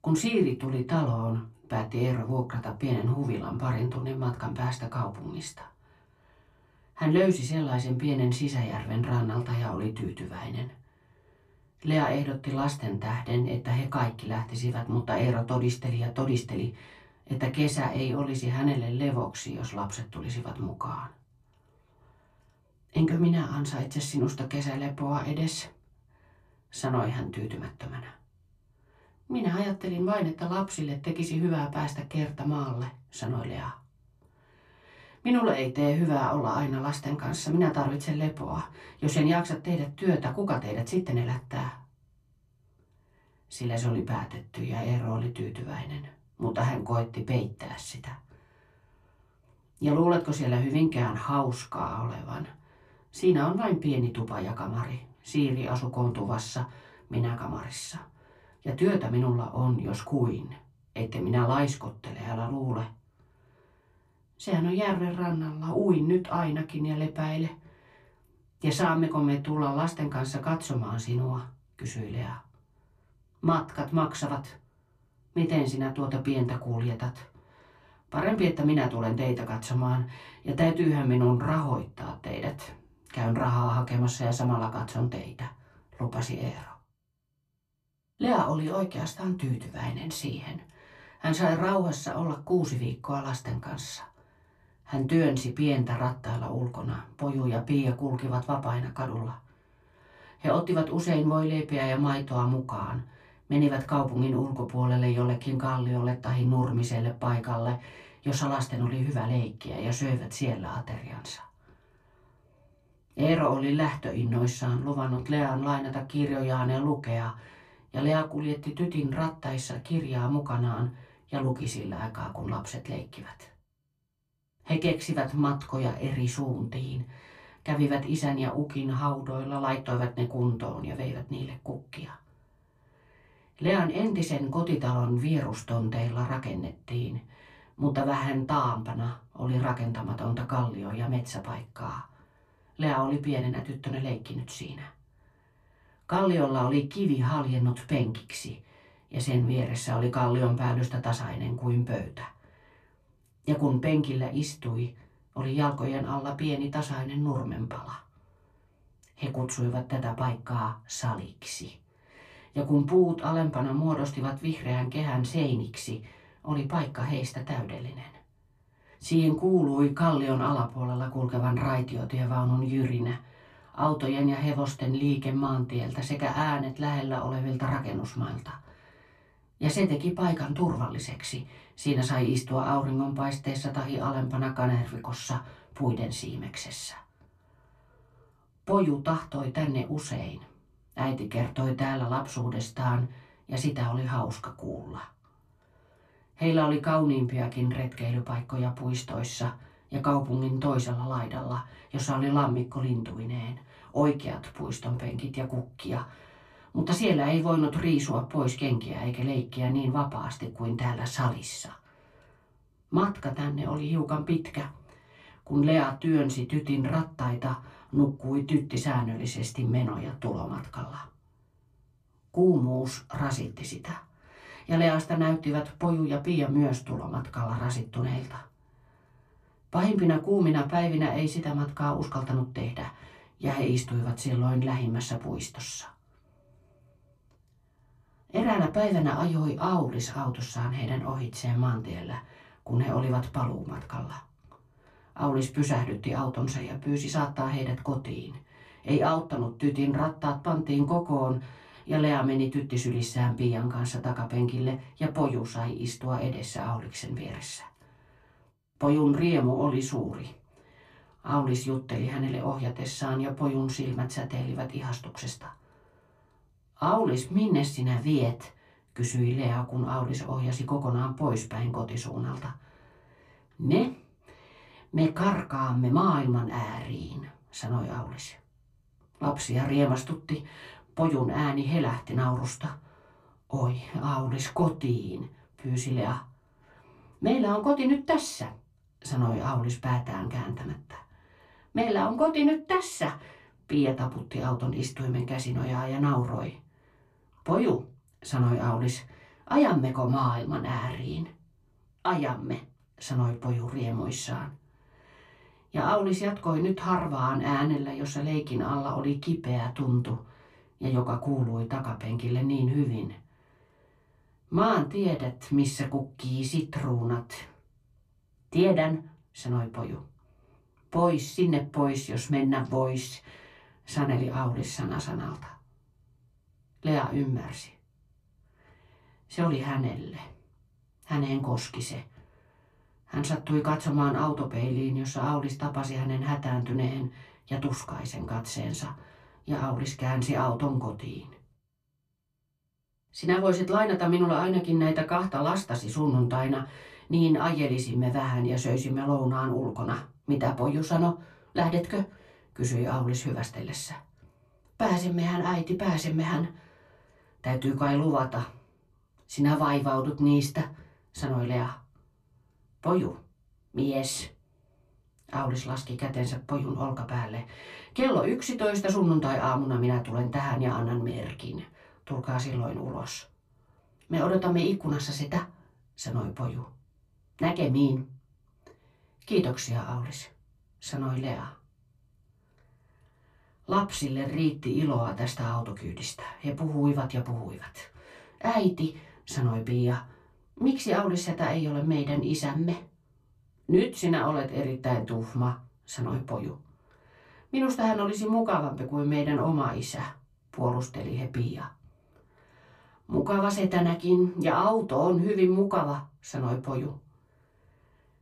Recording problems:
off-mic speech; far
room echo; very slight; dies away in 0.2 s

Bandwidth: 14 kHz